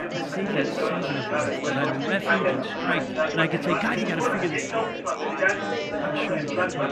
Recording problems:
chatter from many people; very loud; throughout; 4 dB above the speech

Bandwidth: 14.5 kHz